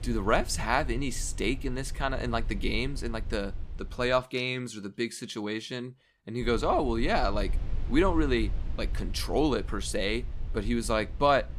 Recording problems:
low rumble; faint; until 4 s and from 6.5 s on; 25 dB below the speech

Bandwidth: 14.5 kHz